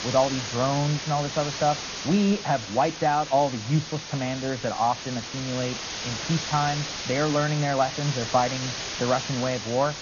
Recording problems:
garbled, watery; slightly; nothing above 6.5 kHz
muffled; very slightly; fading above 3 kHz
hiss; loud; throughout; 6 dB below the speech

